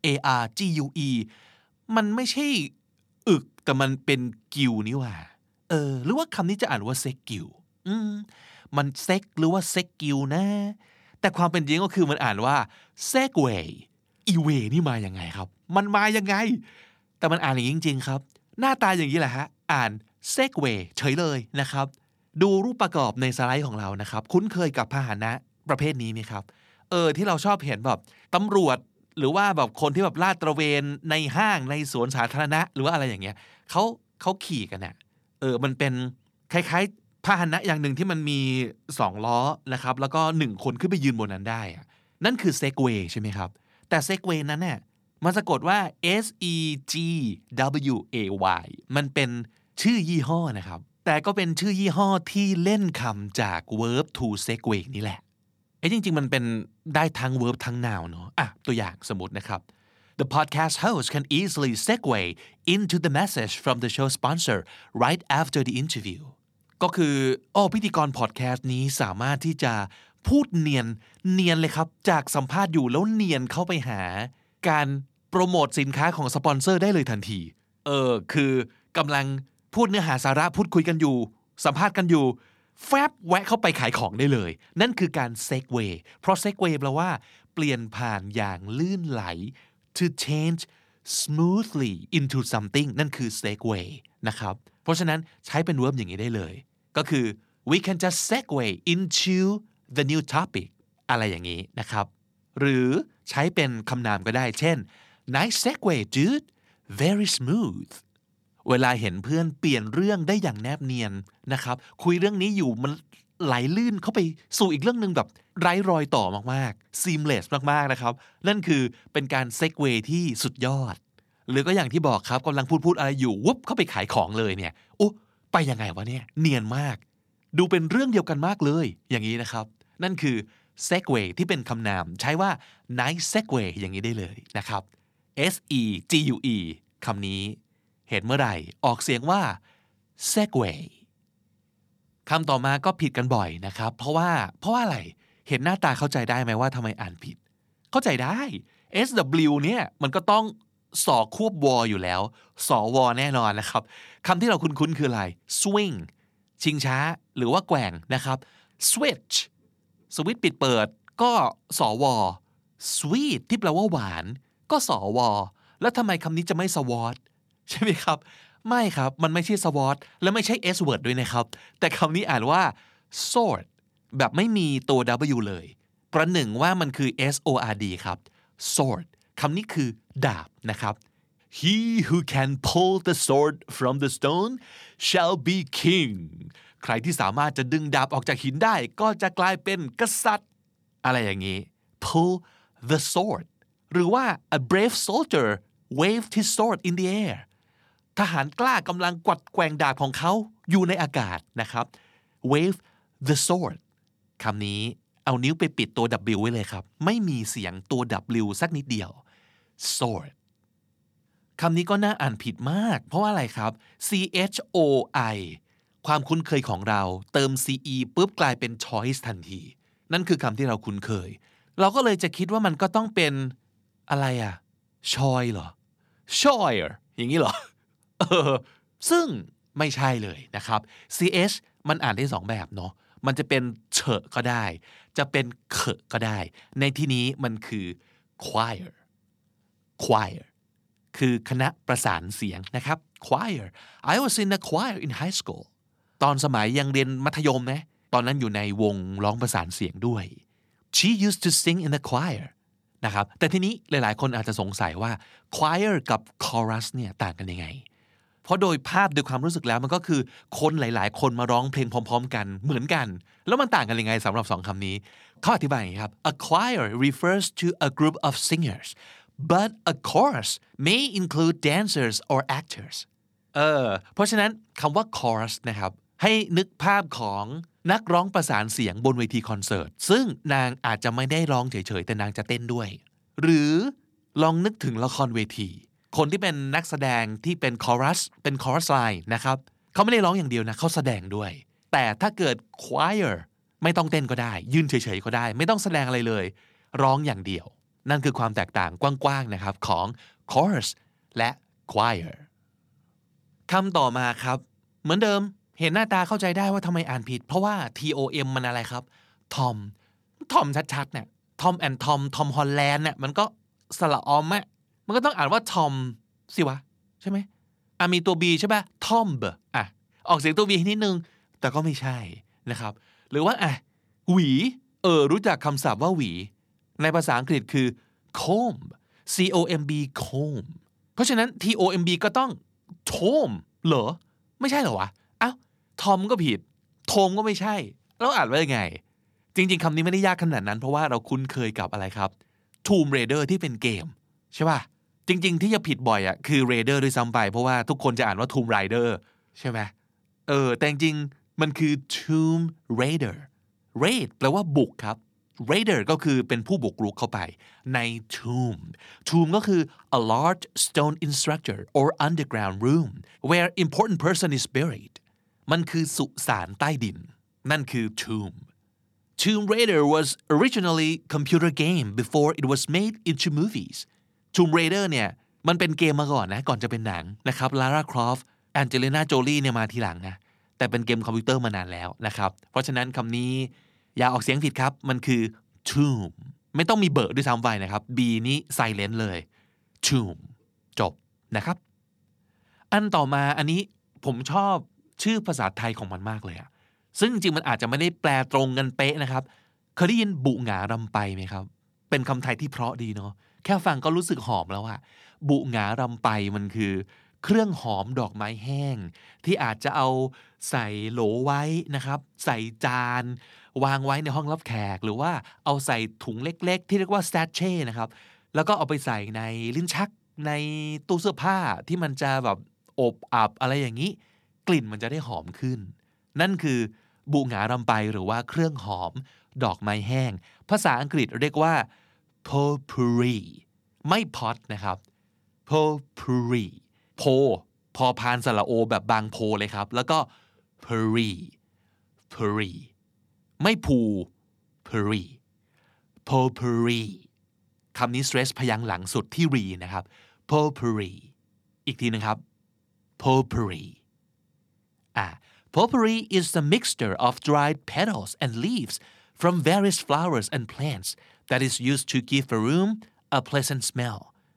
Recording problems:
none

